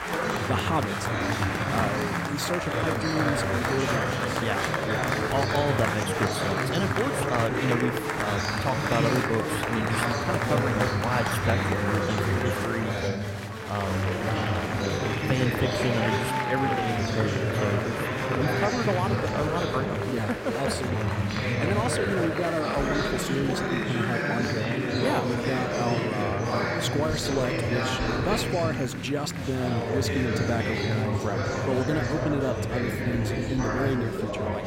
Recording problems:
chatter from many people; very loud; throughout; 3 dB above the speech

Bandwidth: 16 kHz